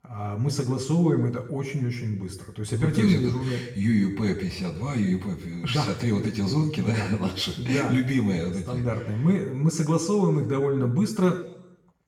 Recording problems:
room echo; slight; dies away in 0.7 s
off-mic speech; somewhat distant

